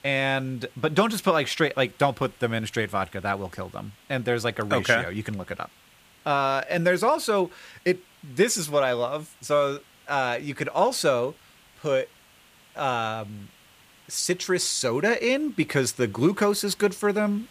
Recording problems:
hiss; faint; throughout; 30 dB below the speech

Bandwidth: 15 kHz